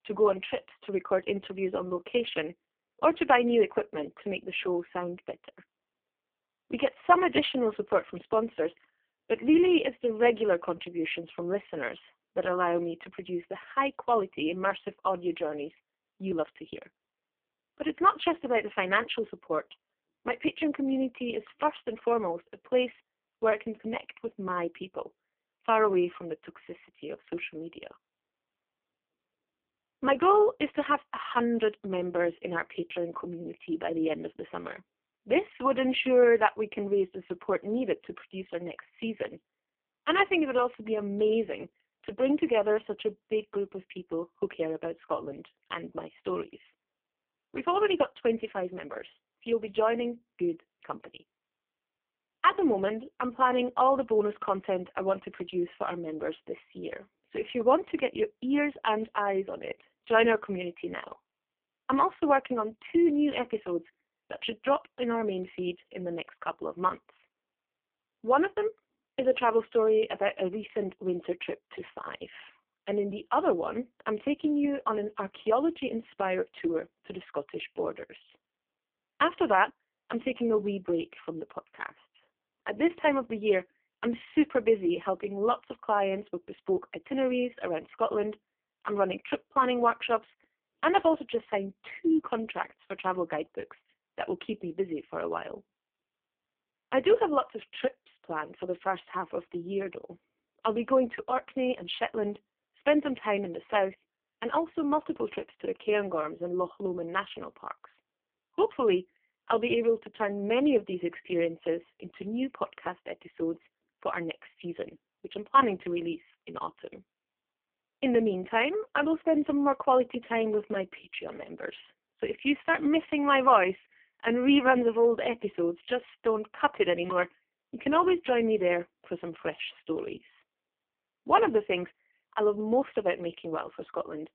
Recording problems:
phone-call audio; poor line

